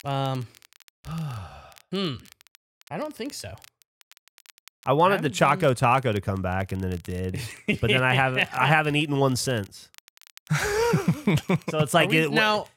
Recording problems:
crackle, like an old record; faint; 30 dB below the speech

